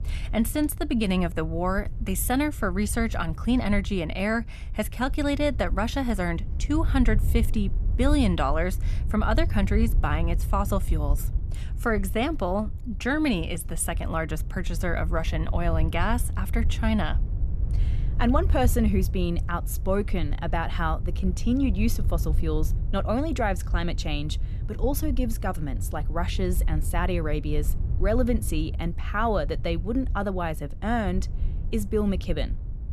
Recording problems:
wind noise on the microphone; occasional gusts; 20 dB below the speech

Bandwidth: 13.5 kHz